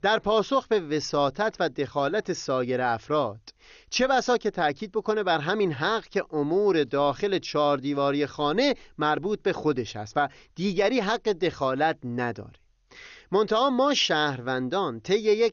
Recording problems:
garbled, watery; slightly; nothing above 6.5 kHz

